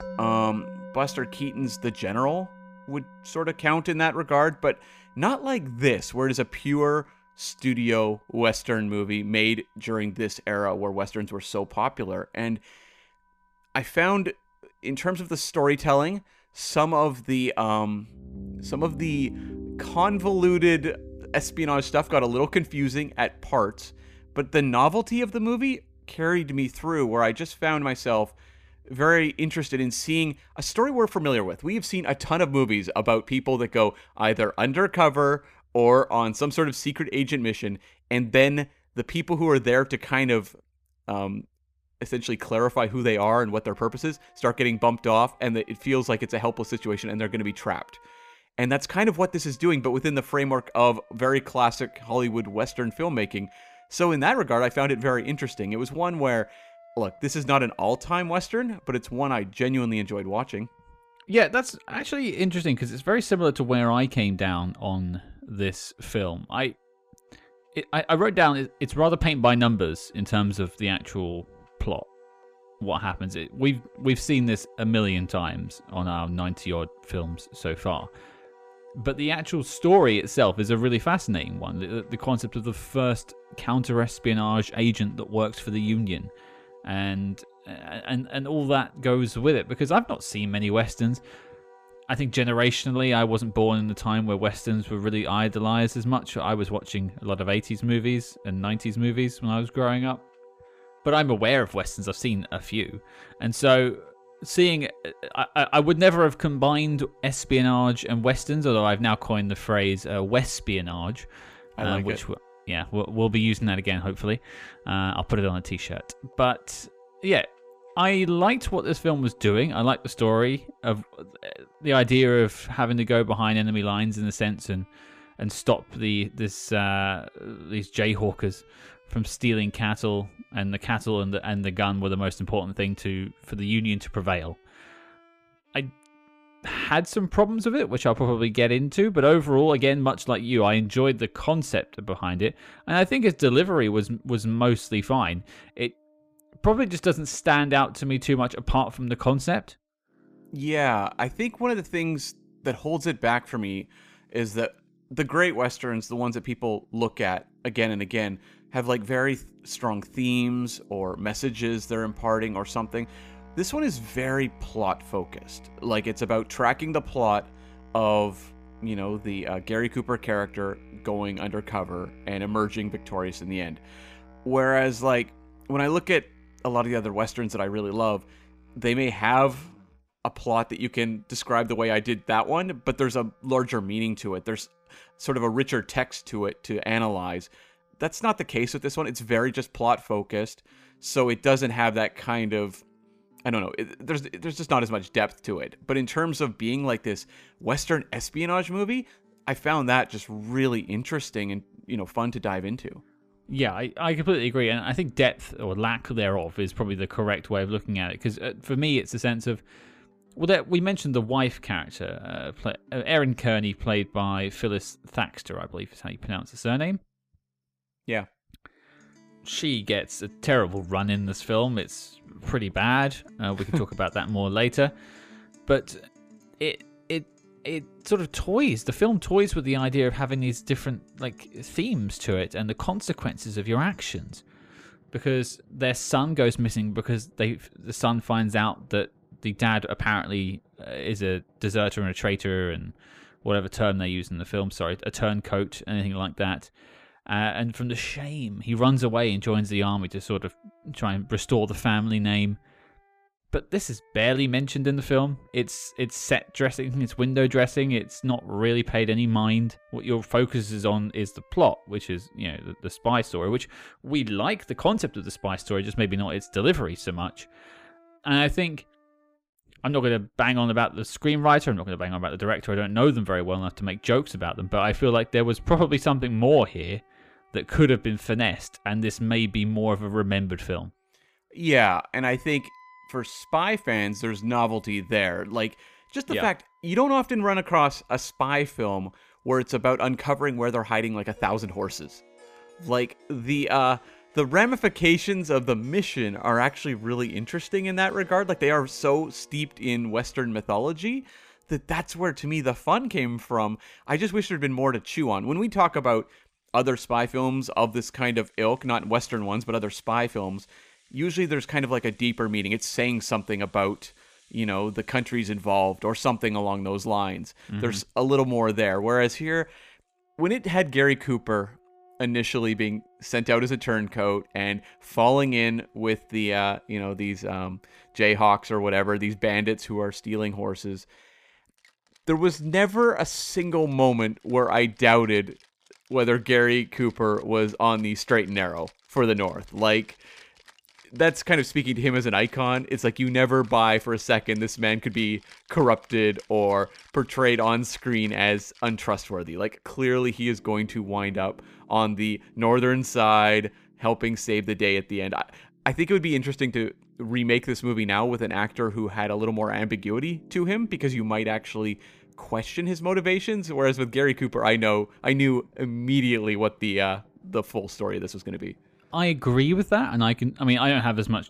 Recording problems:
background music; faint; throughout; 25 dB below the speech

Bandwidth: 15 kHz